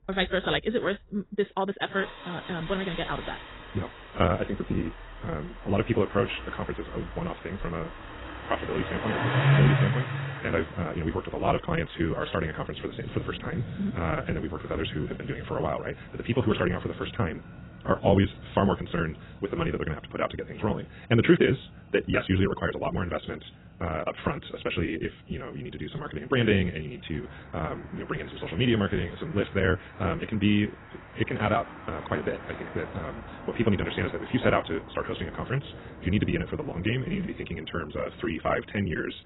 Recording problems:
garbled, watery; badly; nothing above 4 kHz
wrong speed, natural pitch; too fast; 1.7 times normal speed
traffic noise; loud; throughout; 7 dB below the speech

